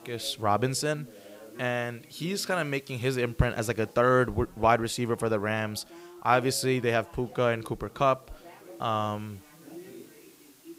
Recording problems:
background chatter; faint; throughout; 3 voices, 20 dB below the speech
hiss; faint; throughout; 30 dB below the speech

